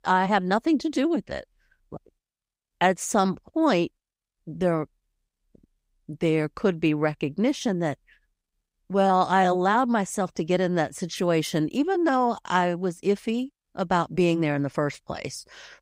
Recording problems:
none

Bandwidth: 15.5 kHz